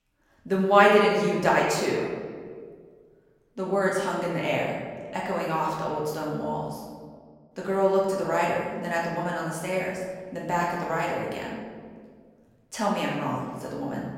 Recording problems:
off-mic speech; far
room echo; noticeable; dies away in 1.5 s

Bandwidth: 16.5 kHz